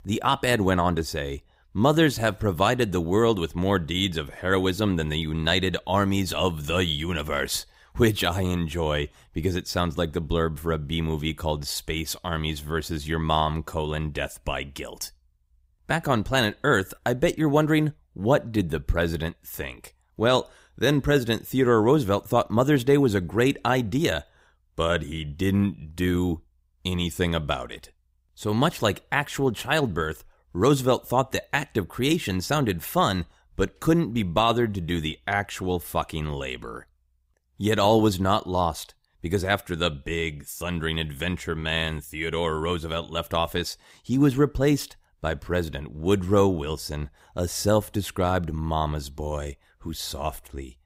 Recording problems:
none

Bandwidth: 15.5 kHz